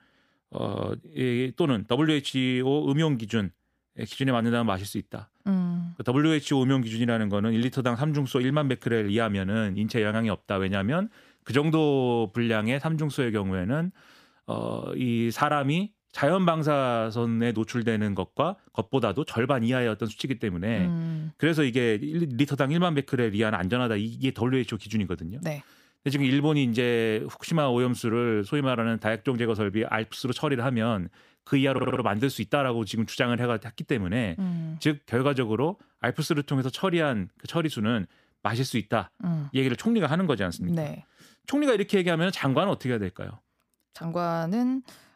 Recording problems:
audio stuttering; at 32 s

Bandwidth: 15 kHz